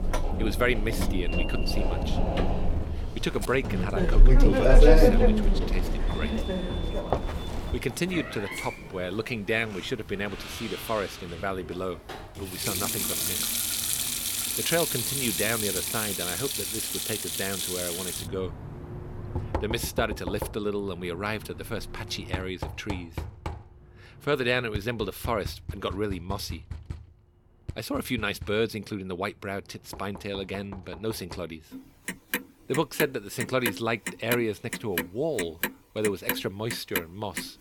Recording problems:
household noises; very loud; throughout; 3 dB above the speech

